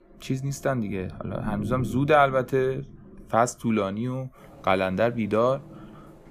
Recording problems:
rain or running water; noticeable; throughout; 15 dB below the speech

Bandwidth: 15 kHz